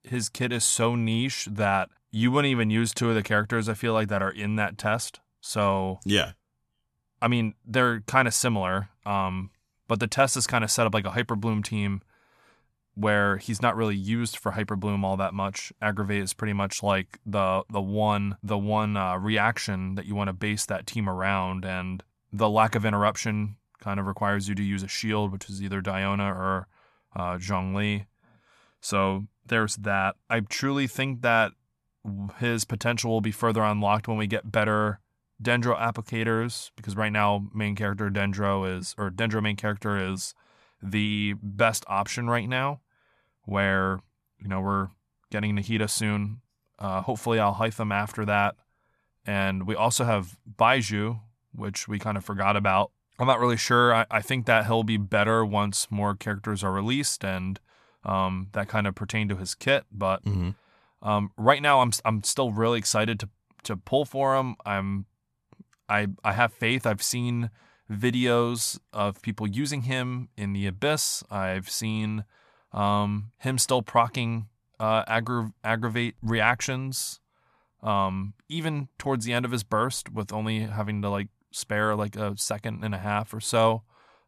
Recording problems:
none

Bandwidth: 13.5 kHz